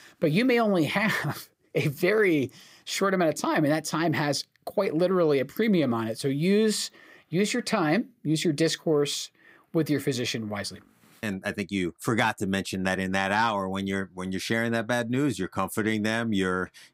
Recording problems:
none

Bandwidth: 15.5 kHz